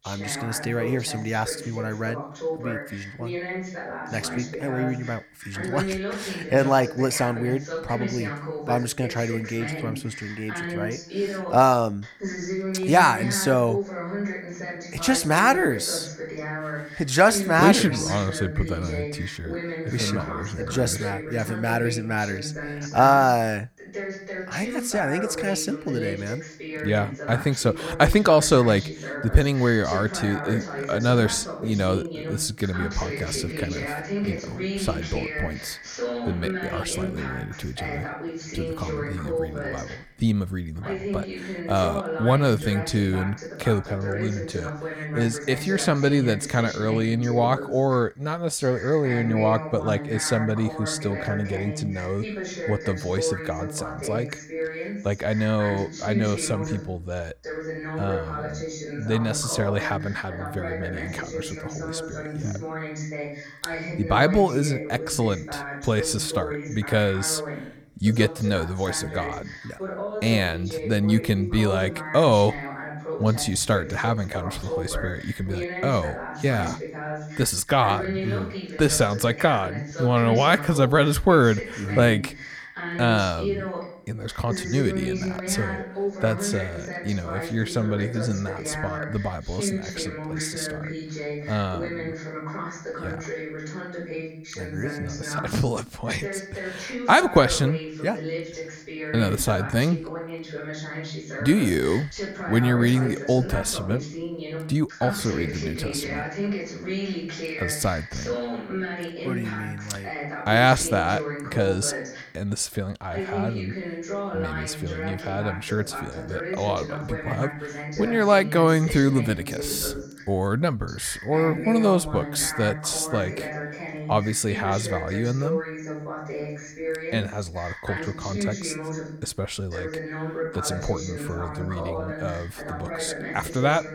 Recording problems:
voice in the background; loud; throughout; 8 dB below the speech

